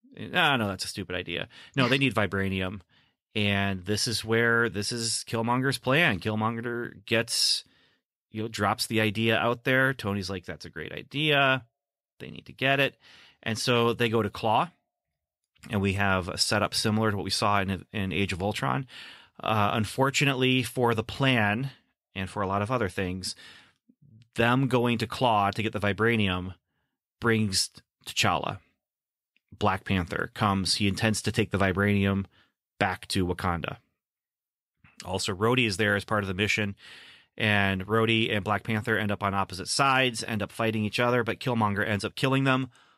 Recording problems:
none

